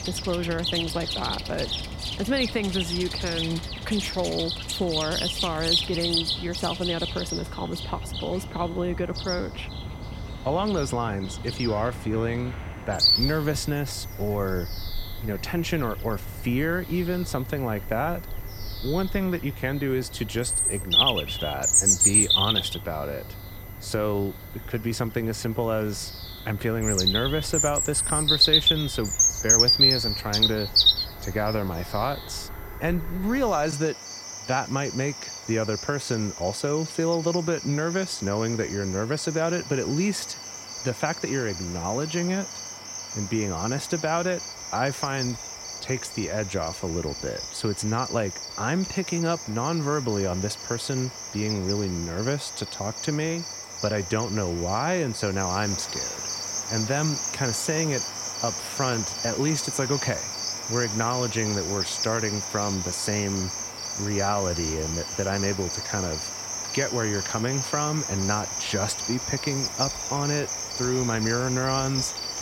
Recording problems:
animal sounds; very loud; throughout; 2 dB above the speech
high-pitched whine; faint; throughout; 2 kHz, 25 dB below the speech

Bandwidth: 16 kHz